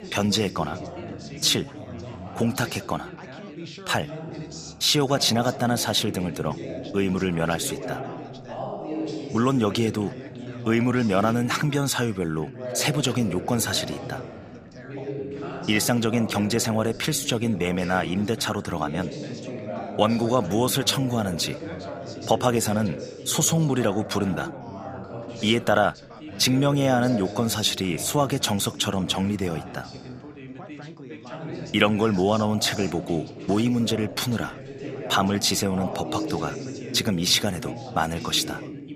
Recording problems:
background chatter; noticeable; throughout; 3 voices, 10 dB below the speech

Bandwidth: 15 kHz